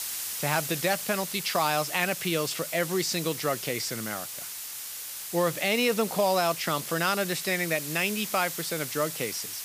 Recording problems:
hiss; loud; throughout; 6 dB below the speech

